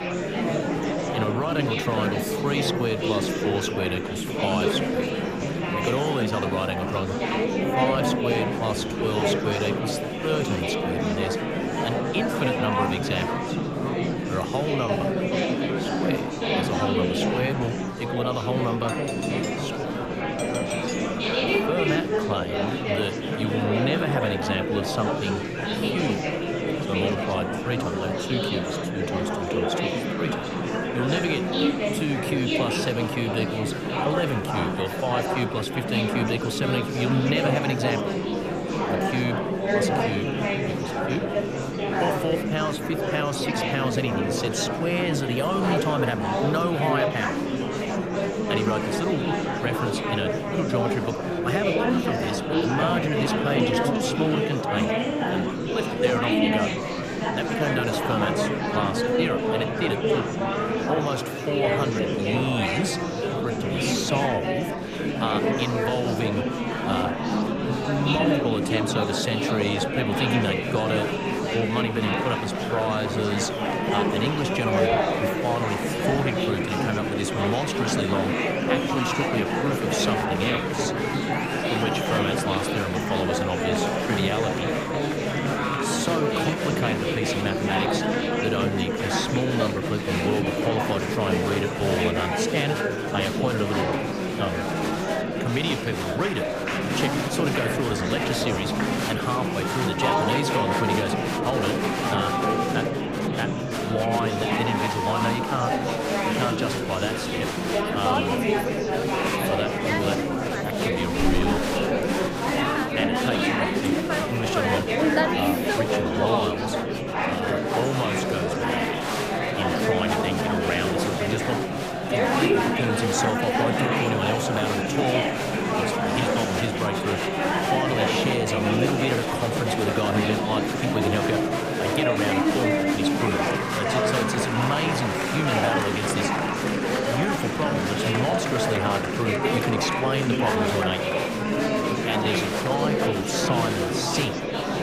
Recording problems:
murmuring crowd; very loud; throughout; 4 dB above the speech
doorbell; noticeable; from 19 to 21 s; peak 2 dB below the speech

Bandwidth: 15 kHz